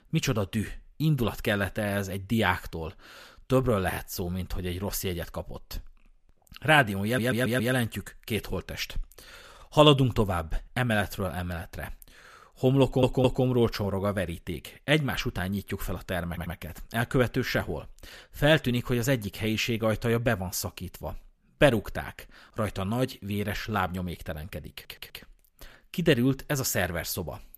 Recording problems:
audio stuttering; 4 times, first at 7 s

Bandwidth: 14.5 kHz